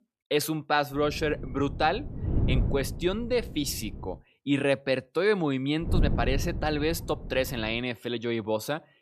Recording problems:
wind noise on the microphone; occasional gusts; from 1 to 4 s and from 6 to 8 s; 15 dB below the speech

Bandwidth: 14 kHz